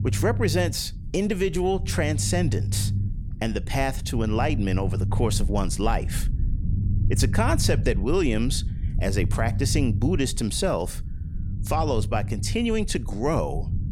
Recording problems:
low rumble; noticeable; throughout; 15 dB below the speech

